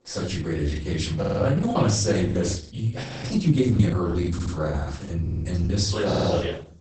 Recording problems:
off-mic speech; far
garbled, watery; badly; nothing above 8 kHz
room echo; noticeable; dies away in 0.4 s
choppy; very; at 1 s, at 2.5 s and from 4 to 5.5 s; 14% of the speech affected
audio stuttering; 4 times, first at 1 s
audio freezing; at 3 s

